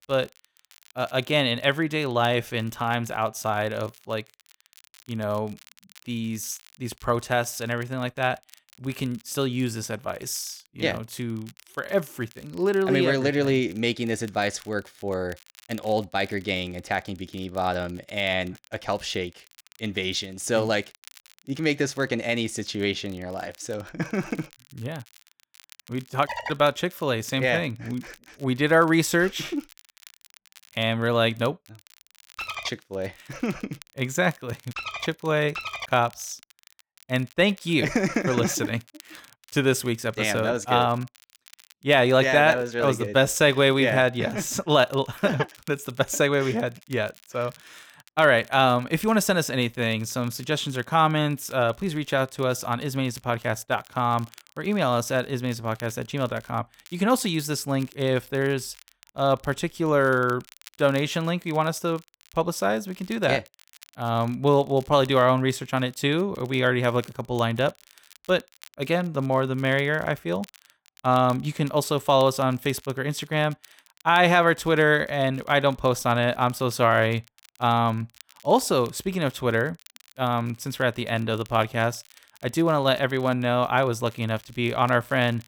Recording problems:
crackle, like an old record; faint; 25 dB below the speech

